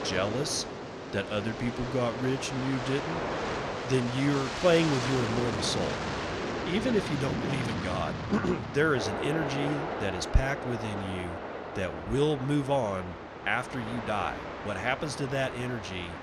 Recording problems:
train or aircraft noise; loud; throughout; 4 dB below the speech

